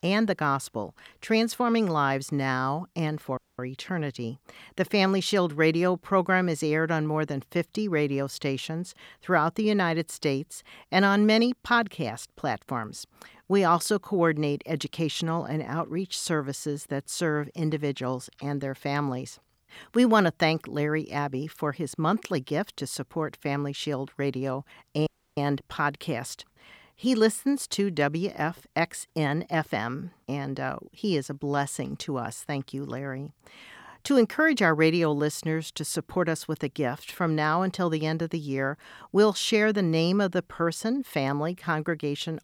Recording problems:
audio cutting out; at 3.5 s and at 25 s

